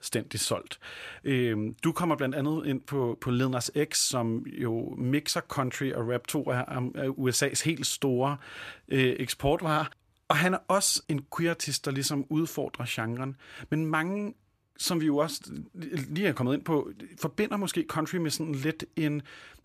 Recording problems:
none

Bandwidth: 14.5 kHz